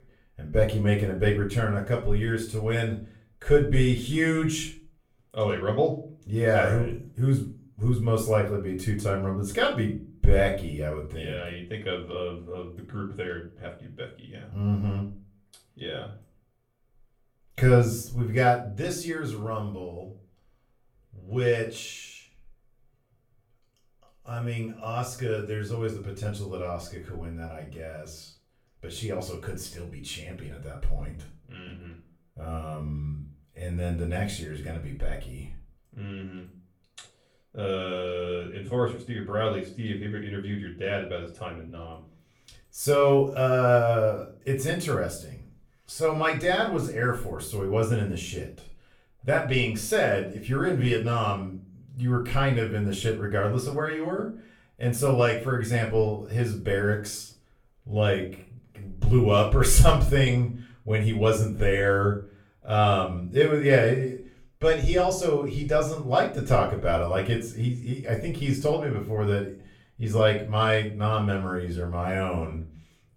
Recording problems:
off-mic speech; far
room echo; slight; dies away in 0.3 s

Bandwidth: 17.5 kHz